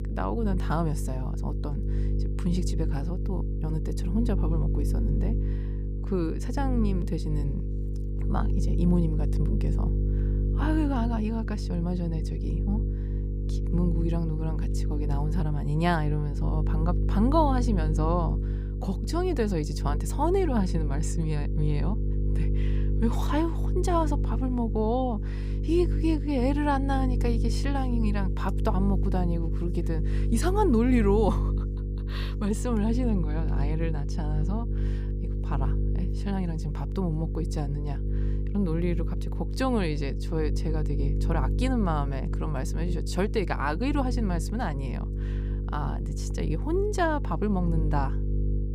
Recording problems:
electrical hum; loud; throughout; 50 Hz, 10 dB below the speech

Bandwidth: 15 kHz